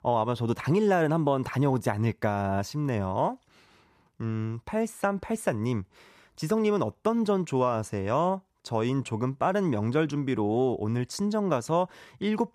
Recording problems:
none

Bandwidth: 14.5 kHz